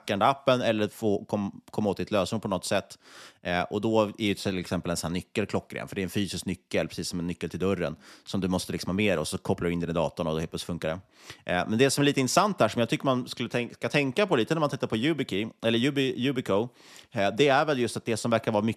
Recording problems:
none

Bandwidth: 13.5 kHz